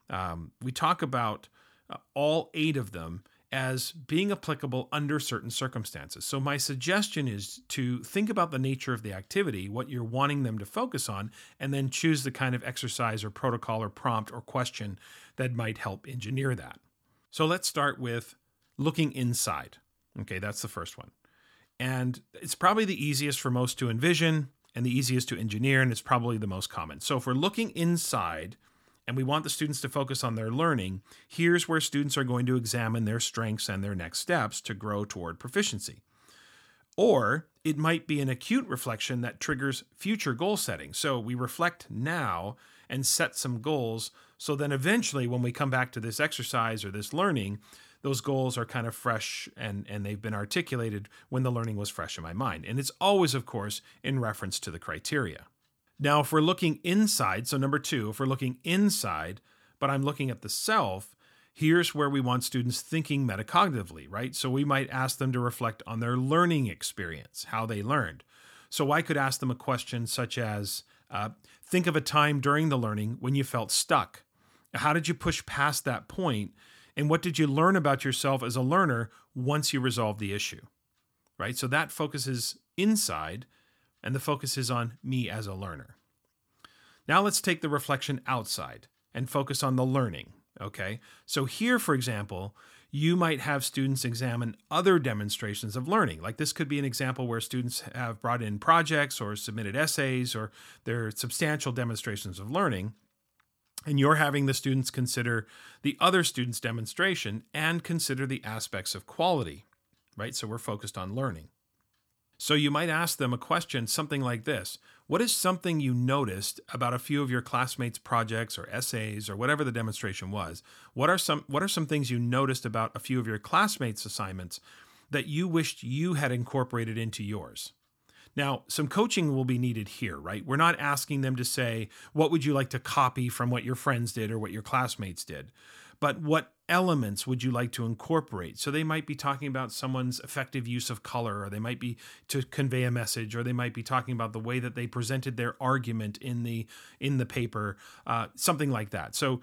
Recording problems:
none

